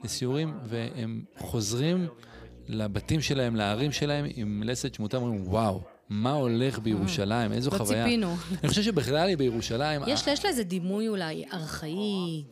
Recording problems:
electrical hum; faint; from 2.5 to 5 s and from 7 to 11 s; 60 Hz, 30 dB below the speech
background chatter; faint; throughout; 3 voices, 20 dB below the speech

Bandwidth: 15 kHz